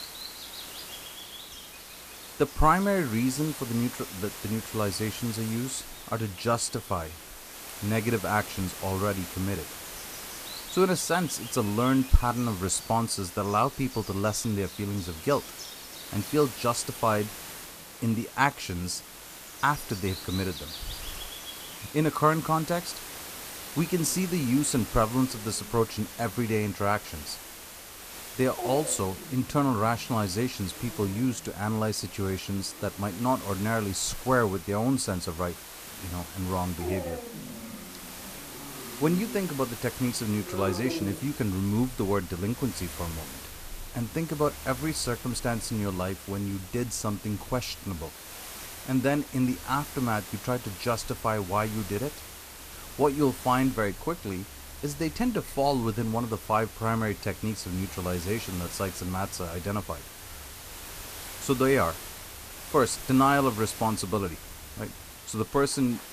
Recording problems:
animal sounds; noticeable; throughout; 15 dB below the speech
hiss; noticeable; throughout; 10 dB below the speech

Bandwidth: 14.5 kHz